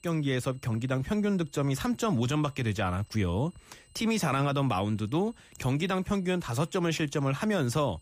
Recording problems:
high-pitched whine; faint; throughout; 8 kHz, 30 dB below the speech

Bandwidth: 15 kHz